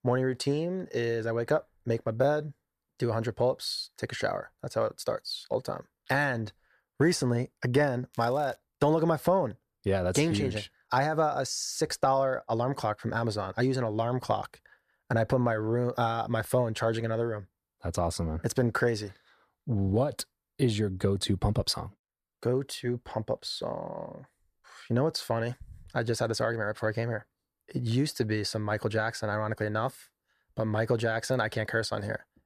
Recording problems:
crackling; faint; at 8 s; 25 dB below the speech

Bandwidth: 14.5 kHz